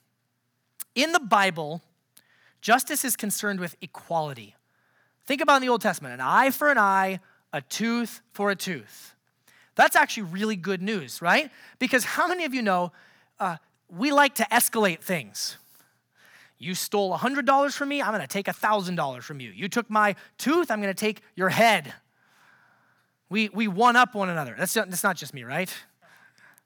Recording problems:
none

